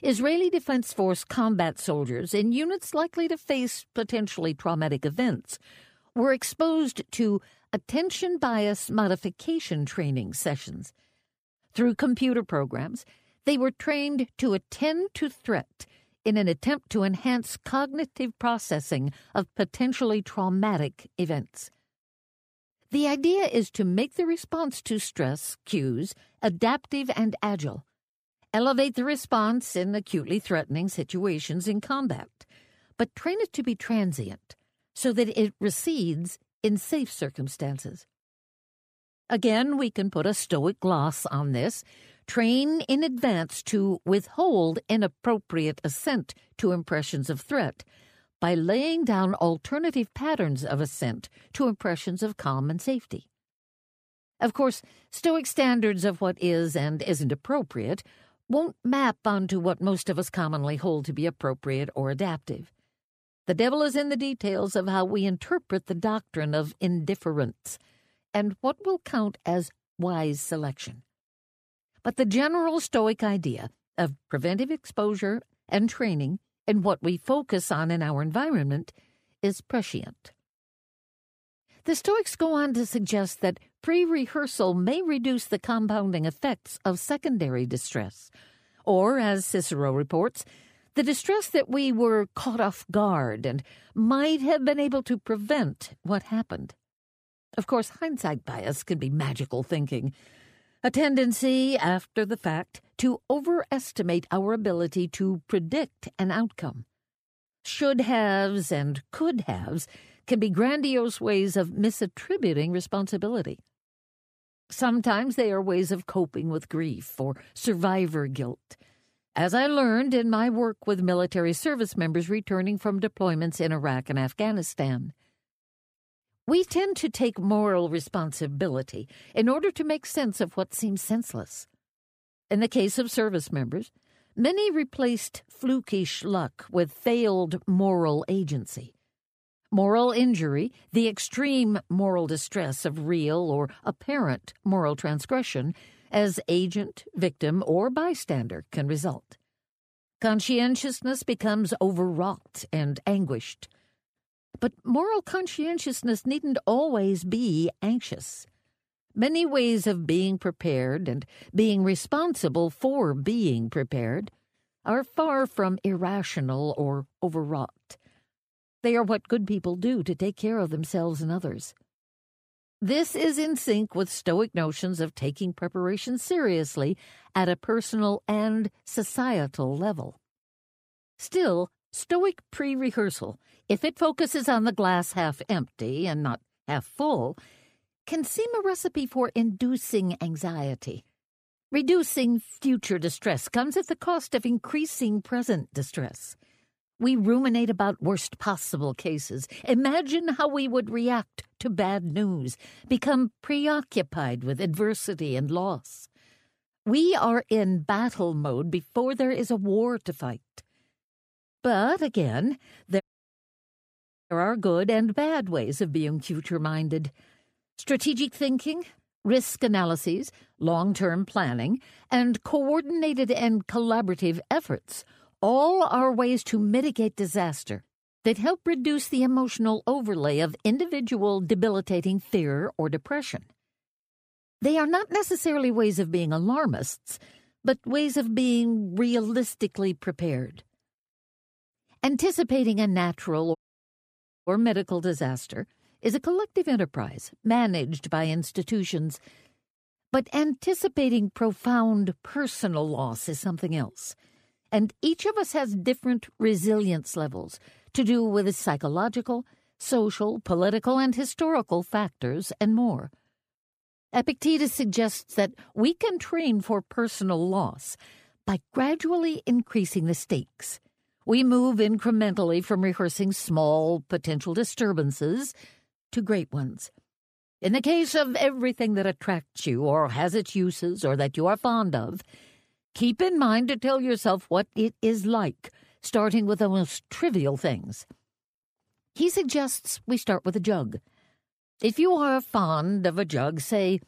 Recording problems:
audio cutting out; at 3:33 for 1.5 s and at 4:04 for 1 s

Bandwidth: 15 kHz